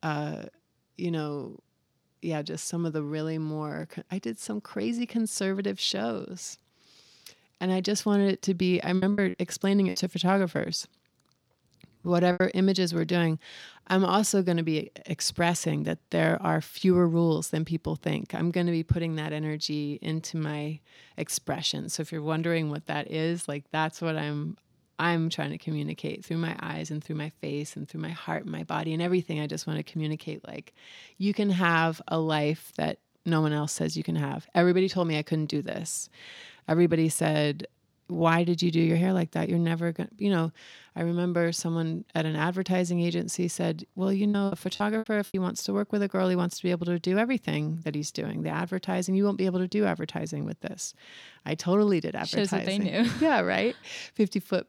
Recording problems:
choppy; very; from 9 to 12 s and from 44 to 45 s; 14% of the speech affected

